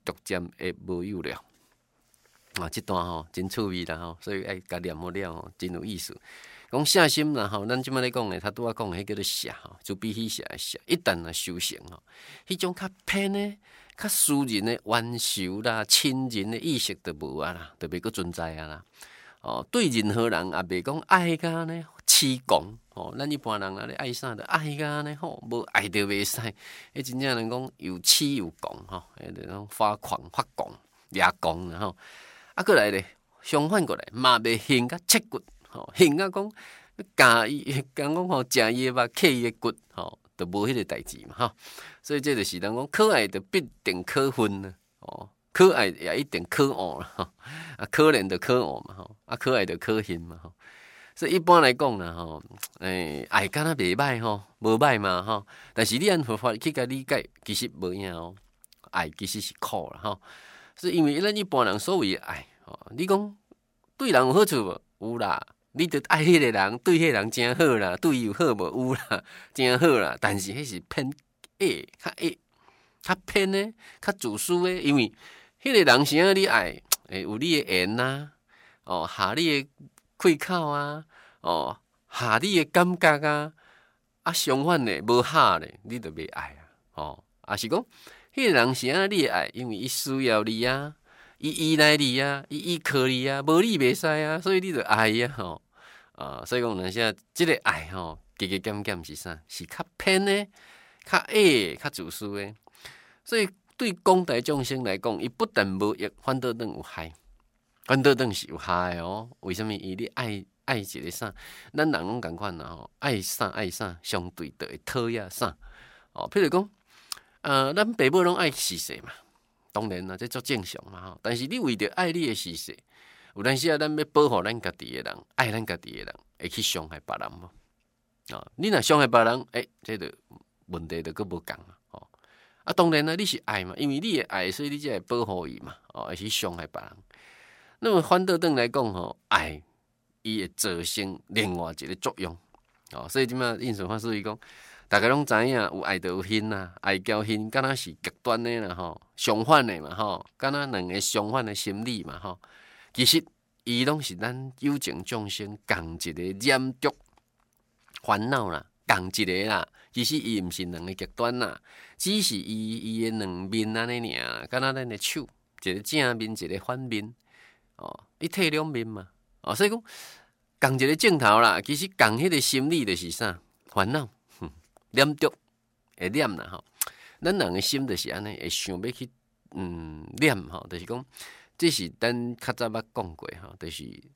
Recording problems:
none

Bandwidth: 16 kHz